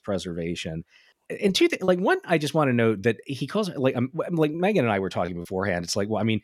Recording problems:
choppy; occasionally; 2% of the speech affected

